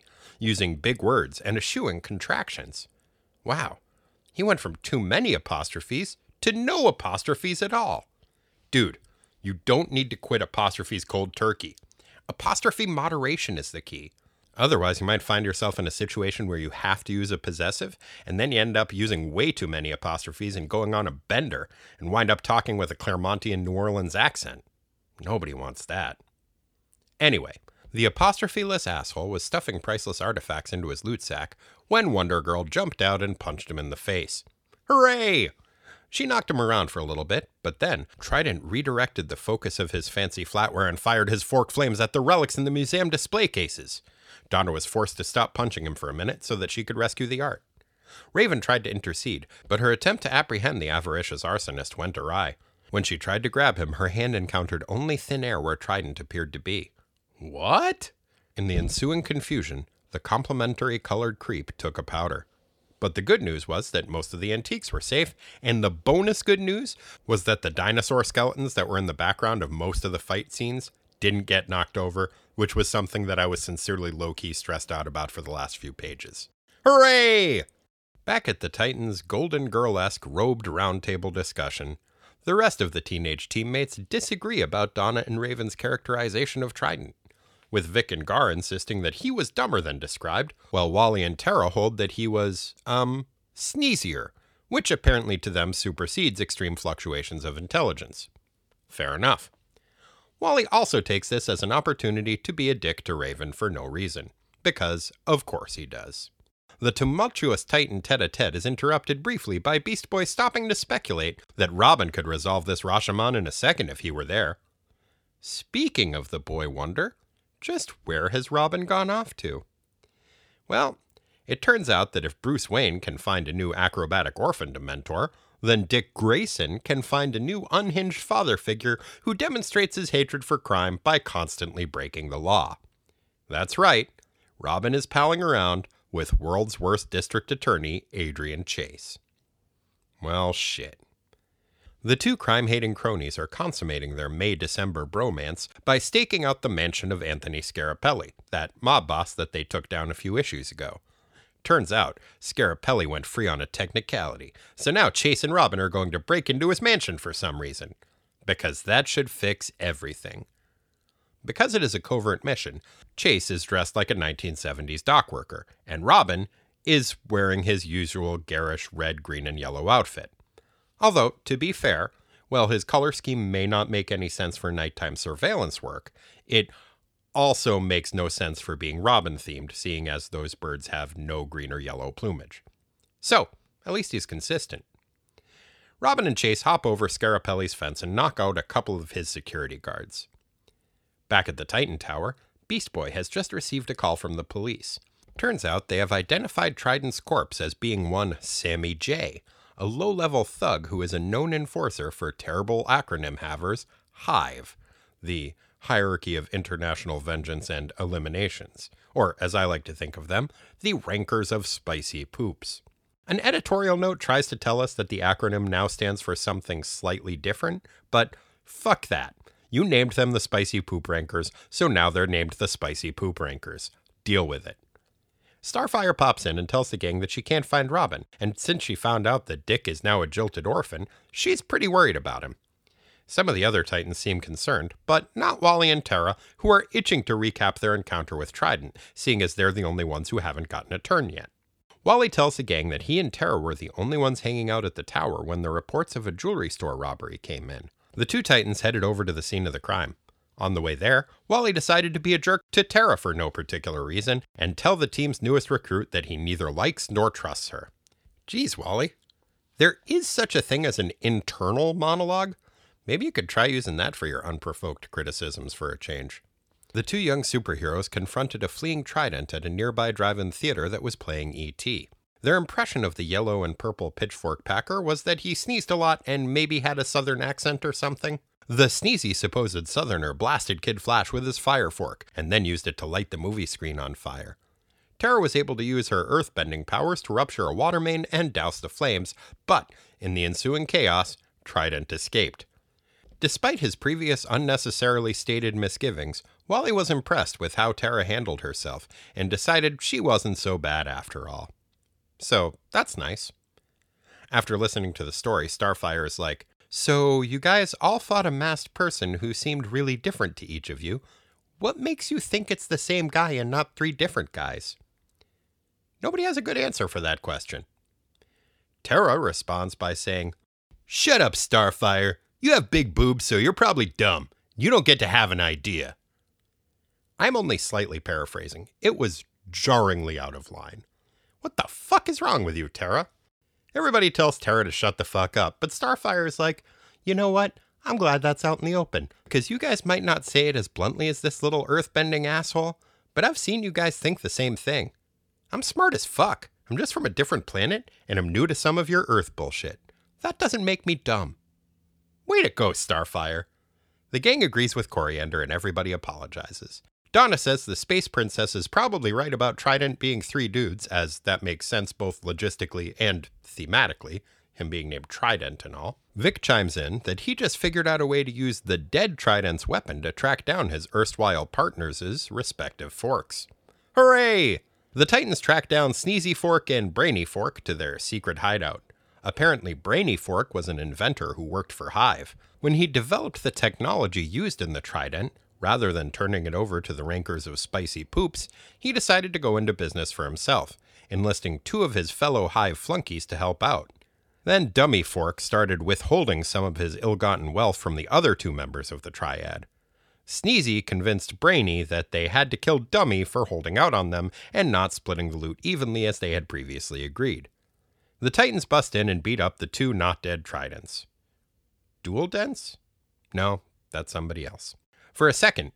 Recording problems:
none

